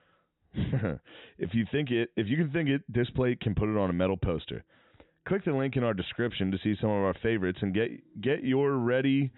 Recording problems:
high frequencies cut off; severe; nothing above 4 kHz

